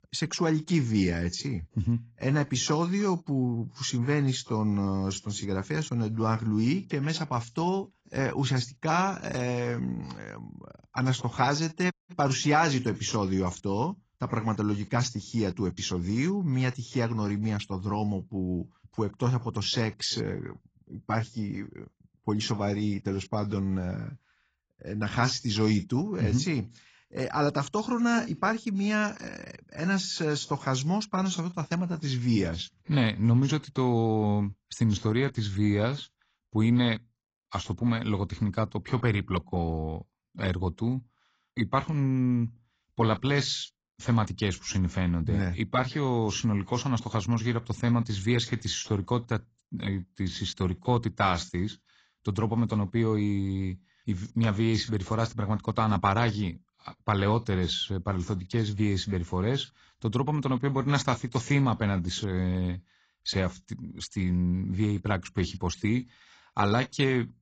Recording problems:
garbled, watery; badly; nothing above 7.5 kHz
audio cutting out; at 12 s

